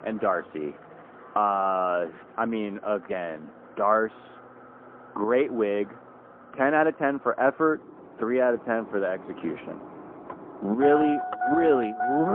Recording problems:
phone-call audio; poor line; nothing above 3 kHz
muffled; very slightly; fading above 2 kHz
traffic noise; loud; throughout; 8 dB below the speech
abrupt cut into speech; at the end

